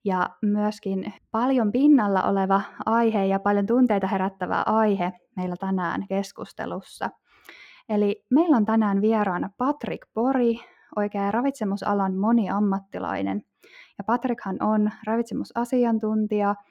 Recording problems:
muffled; slightly; fading above 3 kHz

